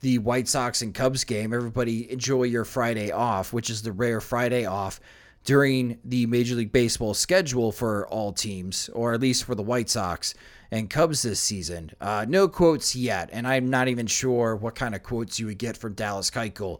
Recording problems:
none

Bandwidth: 18 kHz